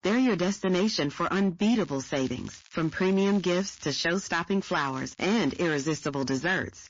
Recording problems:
distortion; slight; 9% of the sound clipped
garbled, watery; slightly; nothing above 7 kHz
crackling; faint; from 2 to 4 s and from 4.5 to 6 s; 25 dB below the speech

